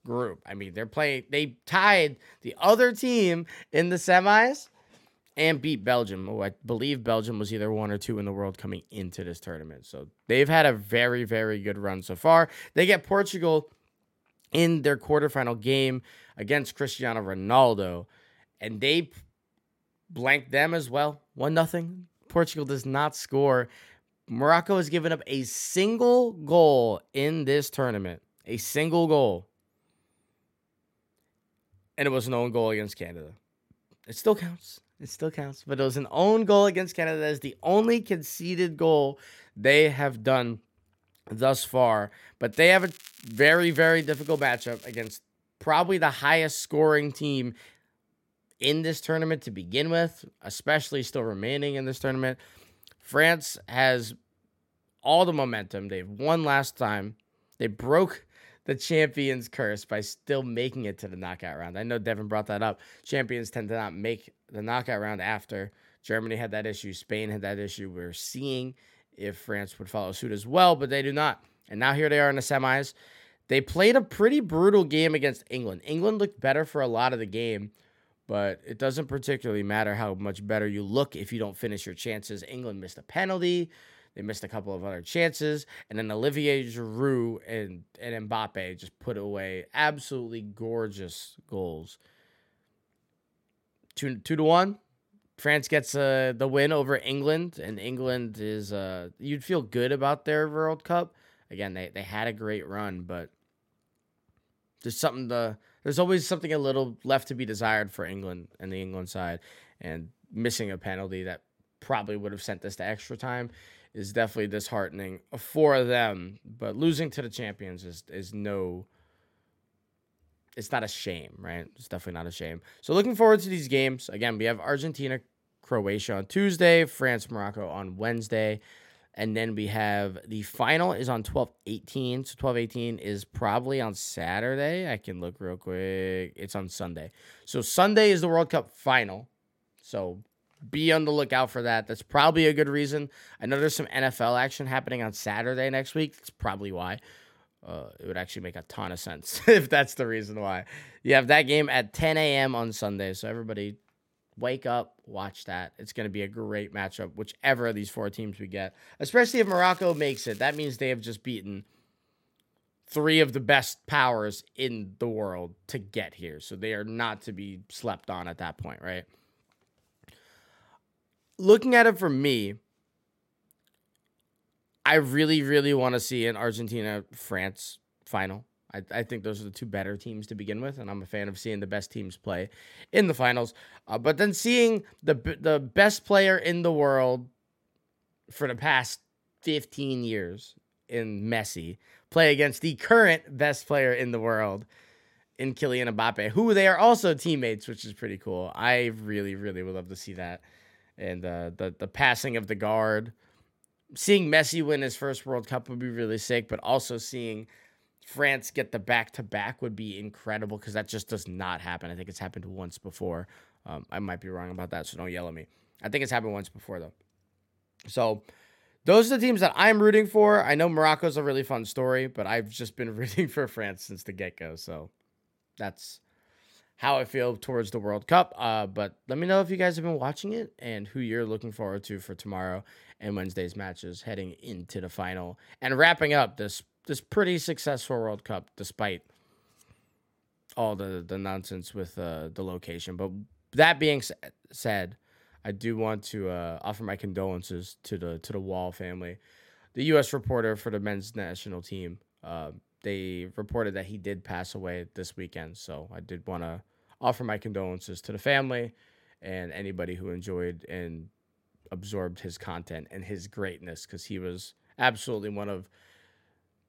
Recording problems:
crackling; faint; from 43 to 45 s, at 2:24 and from 2:39 to 2:41; 20 dB below the speech

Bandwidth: 16.5 kHz